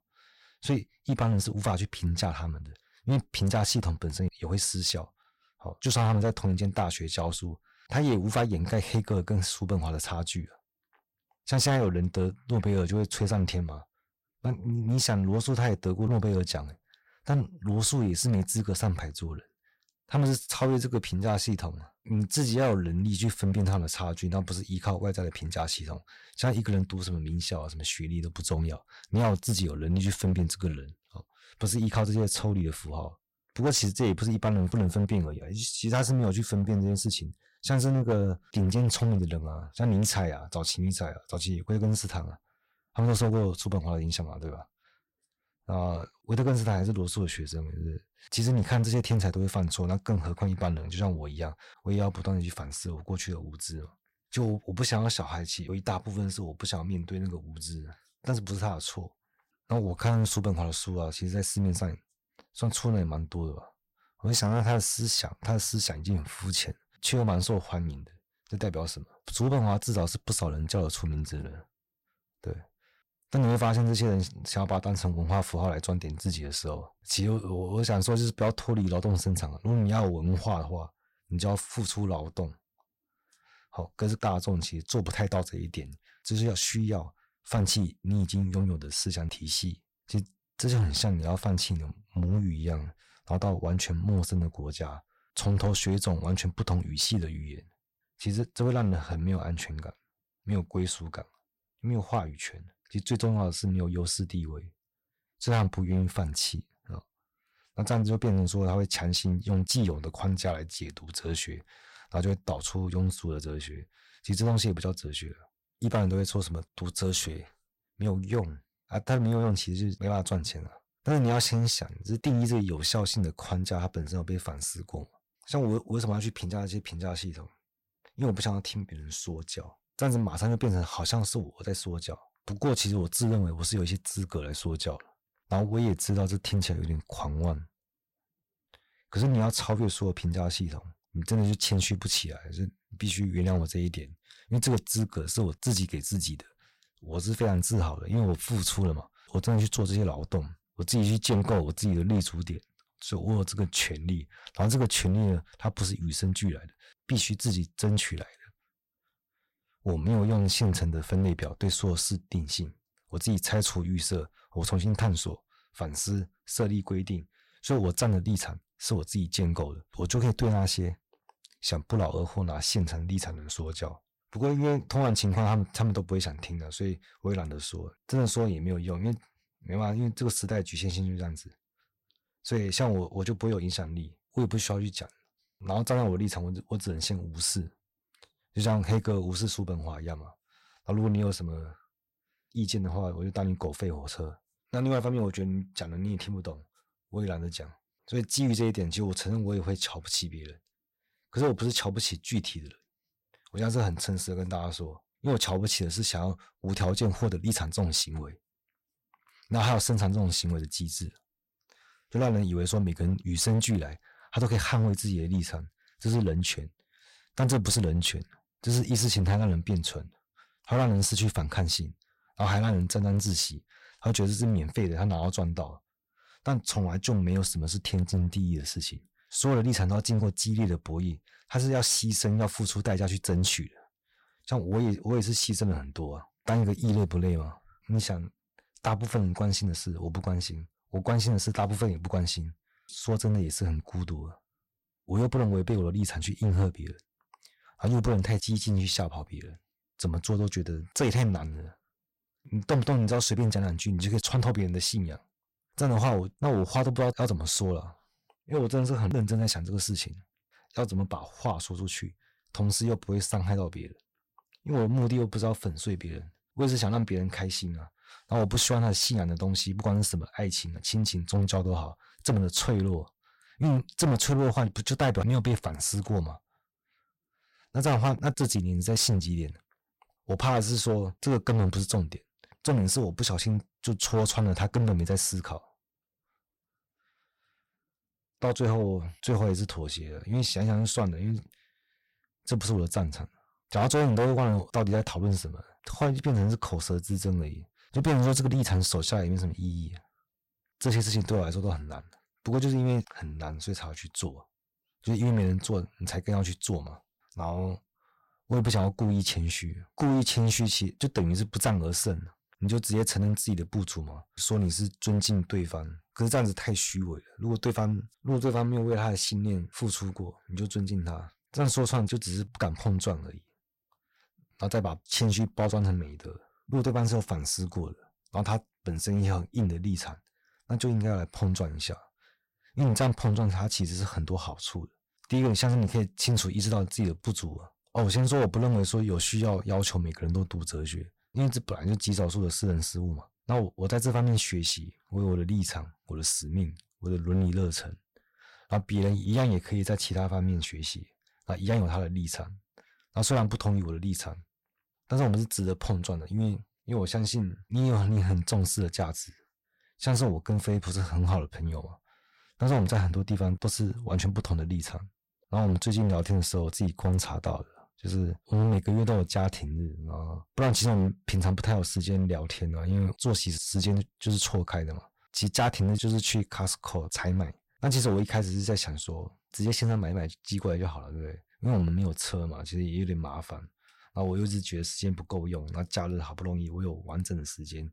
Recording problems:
distortion; slight; 6% of the sound clipped

